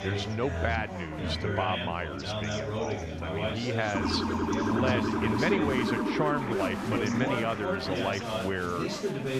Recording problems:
chatter from many people; loud; throughout; 1 dB below the speech
siren; loud; from 4 to 8 s; peak 4 dB above the speech

